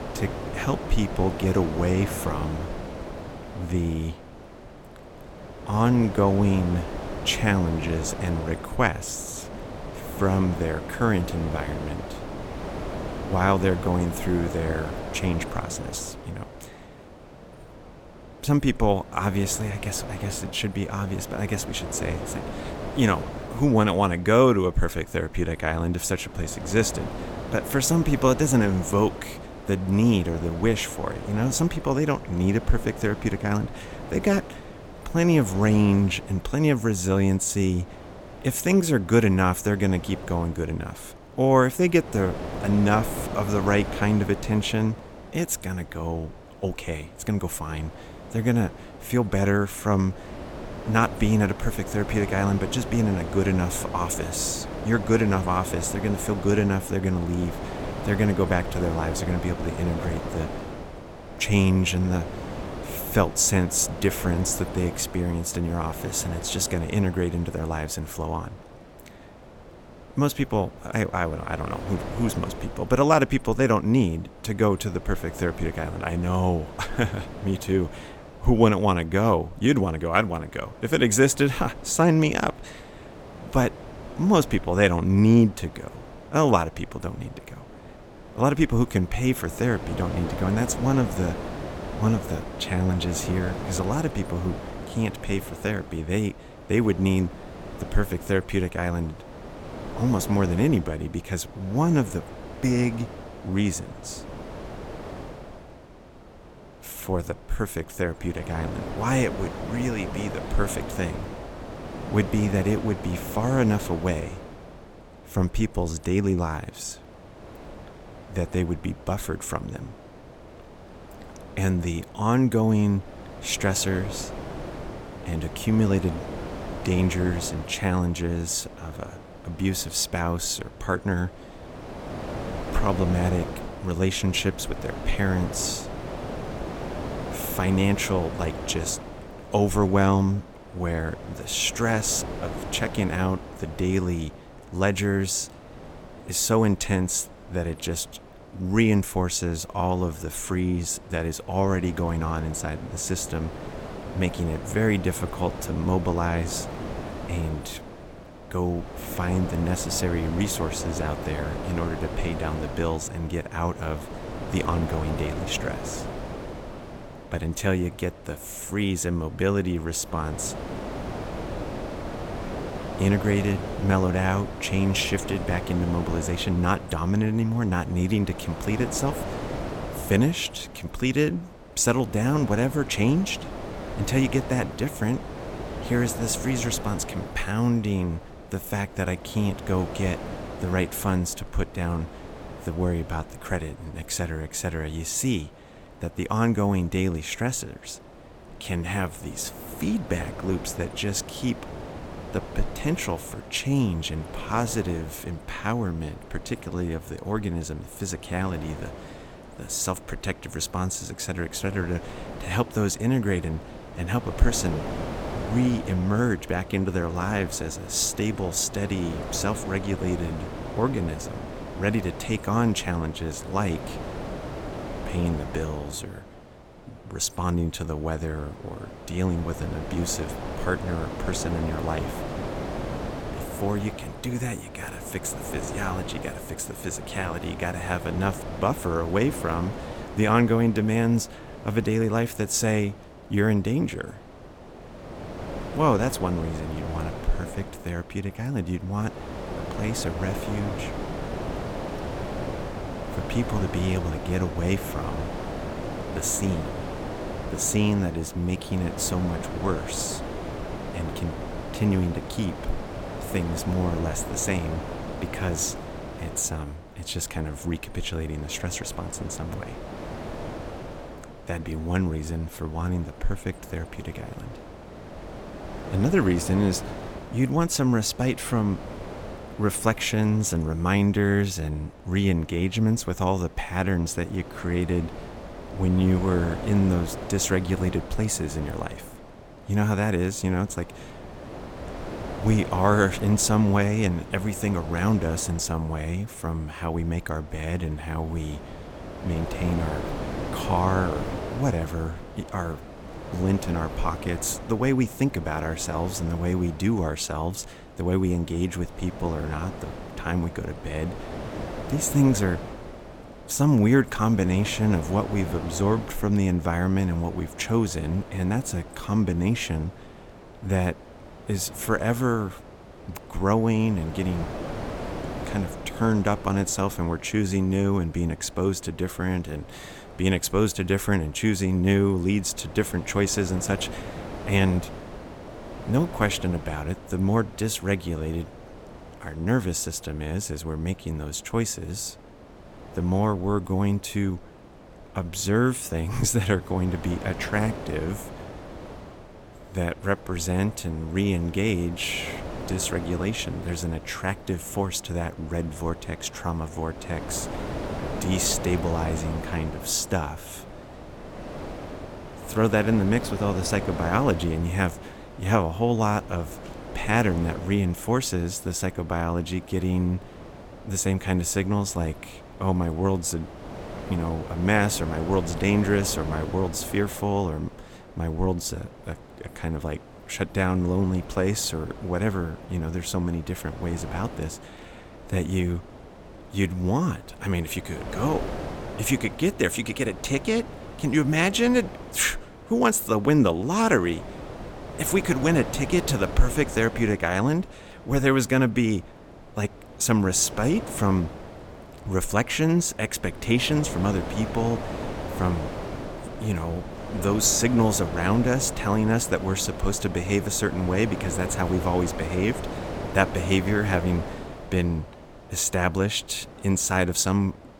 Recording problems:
wind noise on the microphone; heavy; 10 dB below the speech

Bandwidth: 17 kHz